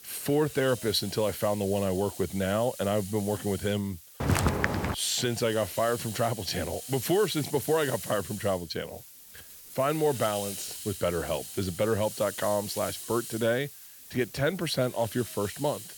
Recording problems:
hiss; noticeable; throughout; 10 dB below the speech
footsteps; loud; at 4 s; peak 4 dB above the speech

